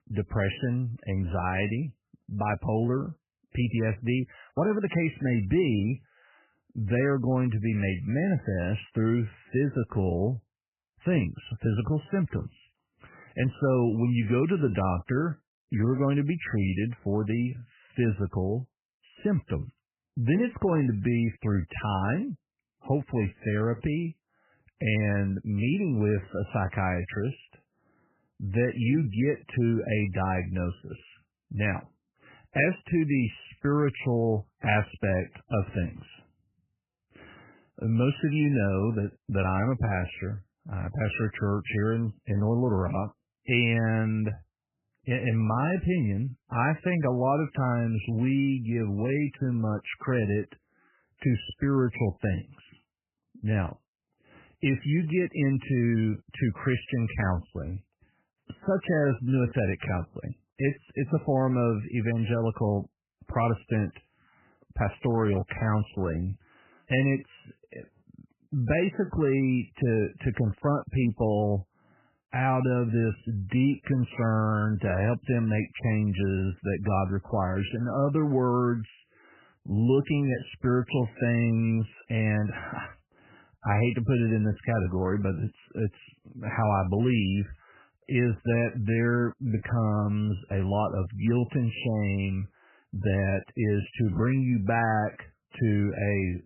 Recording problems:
garbled, watery; badly; nothing above 3 kHz

